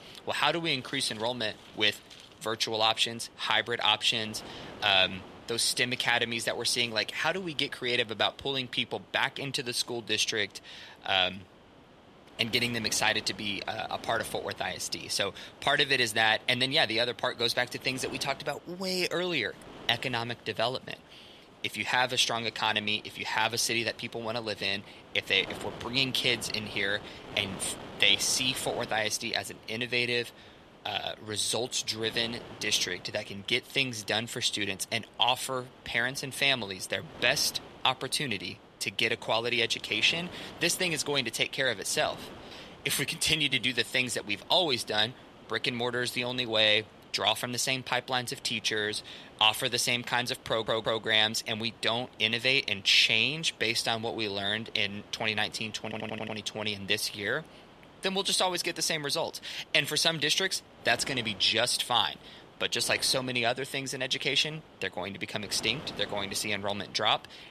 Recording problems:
thin; somewhat; fading below 1 kHz
wind noise on the microphone; occasional gusts; 20 dB below the speech
audio stuttering; at 50 s and at 56 s

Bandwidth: 13.5 kHz